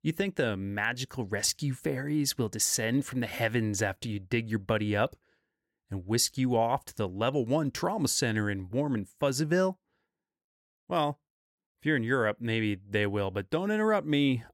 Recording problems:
none

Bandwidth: 16.5 kHz